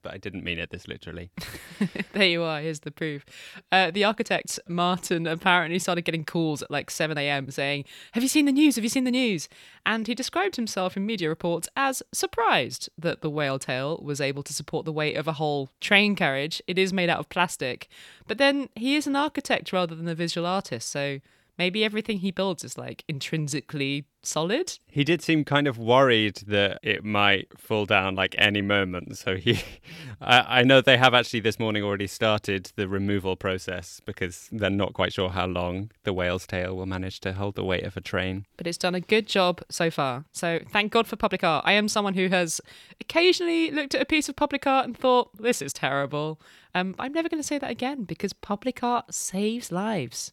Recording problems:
uneven, jittery; strongly; from 3 to 50 s

